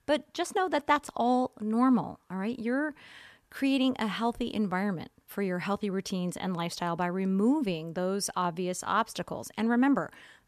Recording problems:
none

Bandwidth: 14 kHz